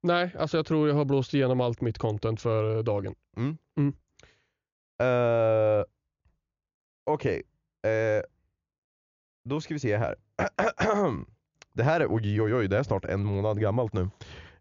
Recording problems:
high frequencies cut off; noticeable; nothing above 7 kHz

